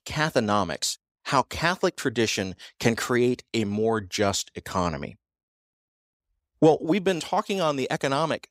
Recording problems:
none

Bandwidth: 15.5 kHz